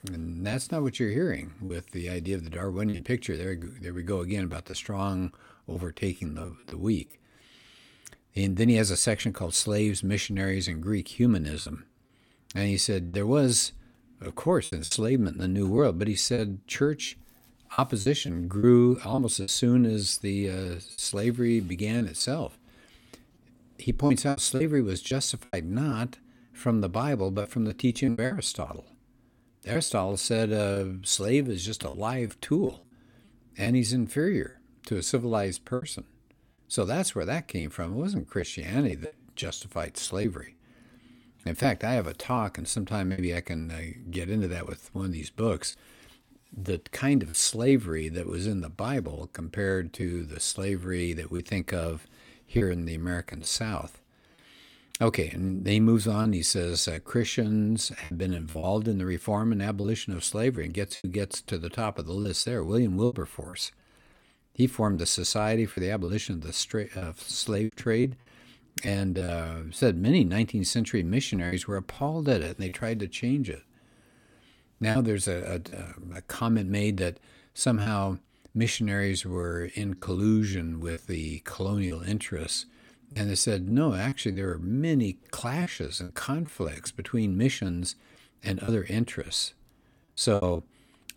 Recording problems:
choppy; very; 6% of the speech affected

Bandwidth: 17 kHz